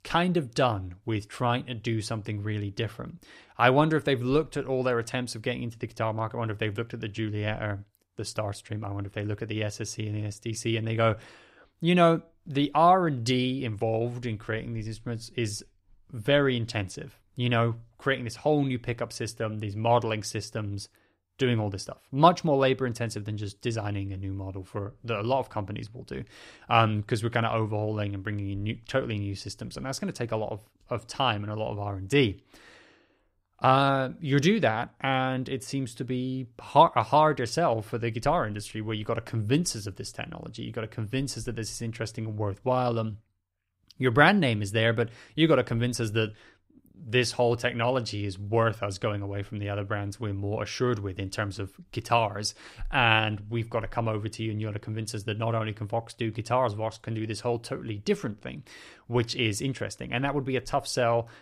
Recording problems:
none

